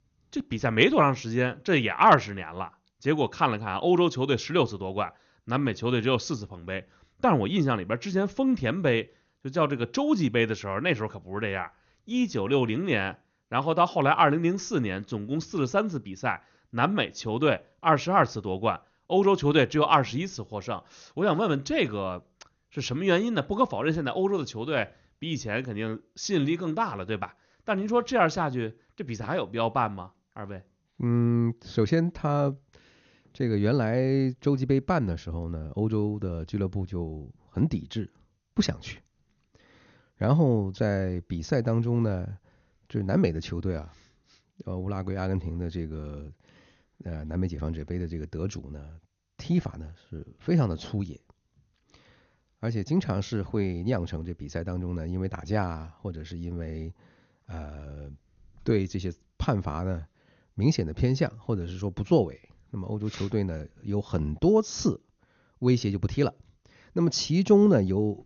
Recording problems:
garbled, watery; slightly; nothing above 6.5 kHz

